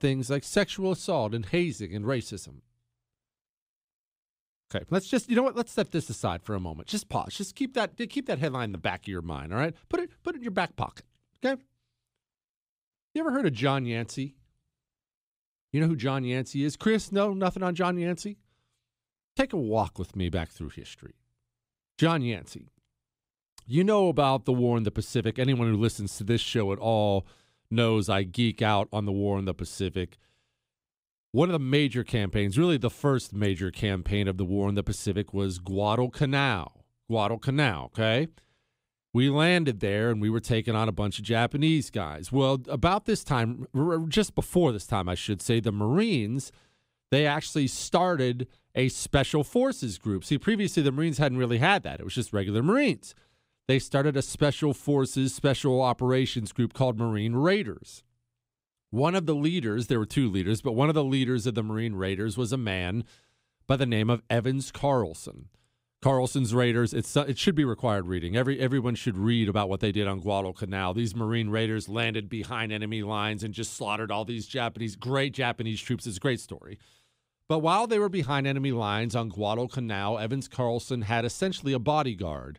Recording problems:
none

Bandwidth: 15.5 kHz